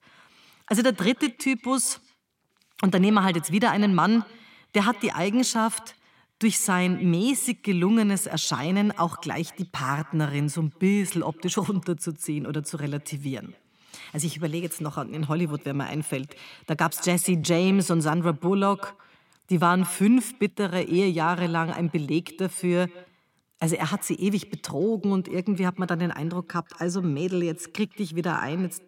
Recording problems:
echo of what is said; faint; throughout; 160 ms later, 25 dB below the speech

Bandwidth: 16.5 kHz